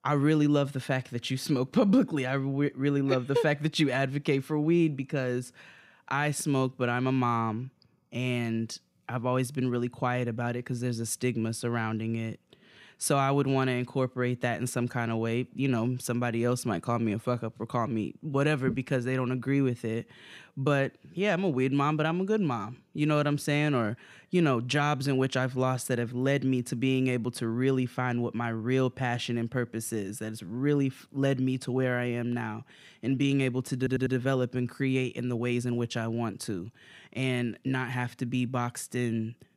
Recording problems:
audio stuttering; at 34 s

